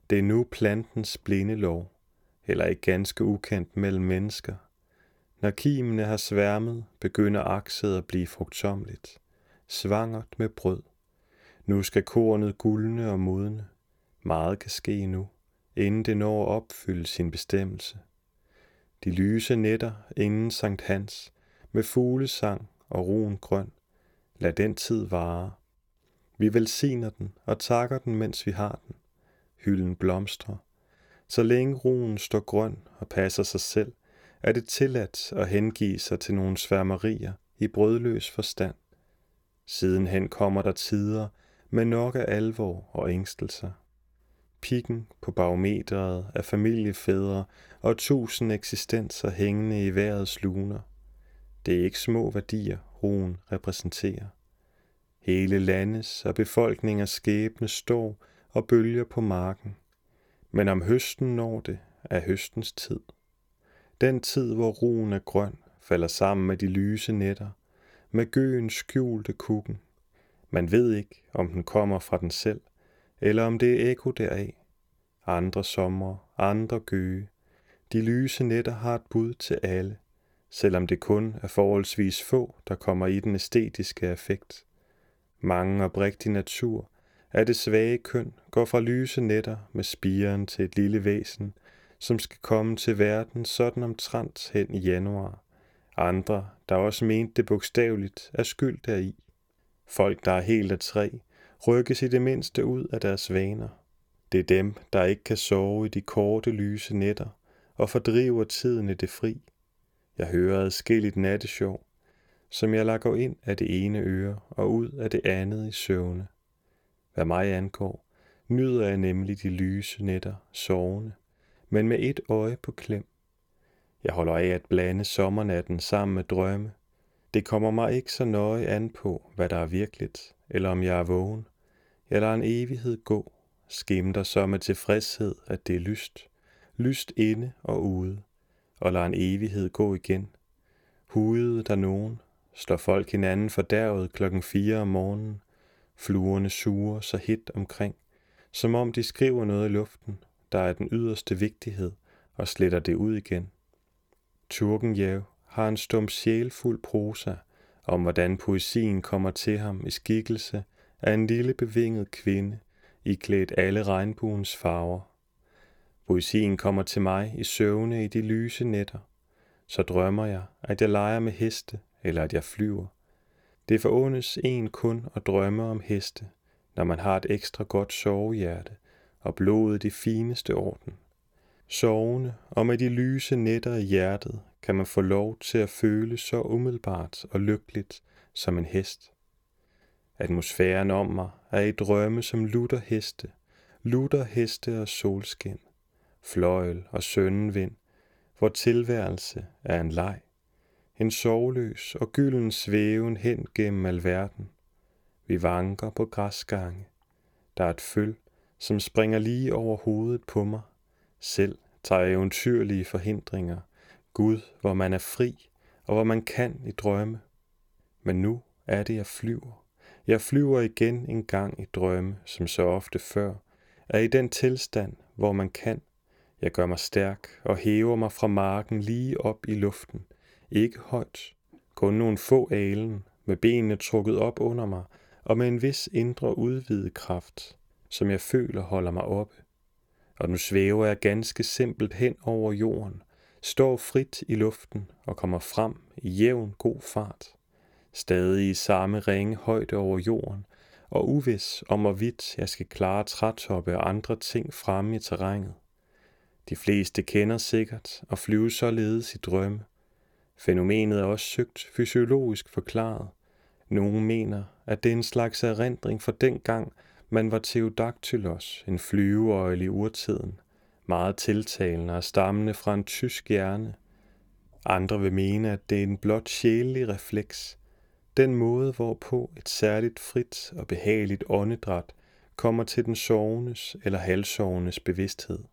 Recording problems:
none

